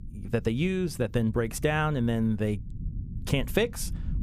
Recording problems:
low rumble; faint; throughout; 25 dB below the speech

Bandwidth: 15 kHz